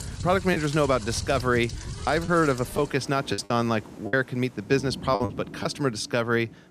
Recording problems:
rain or running water; noticeable; throughout; 15 dB below the speech
choppy; very; 6% of the speech affected

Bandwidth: 14.5 kHz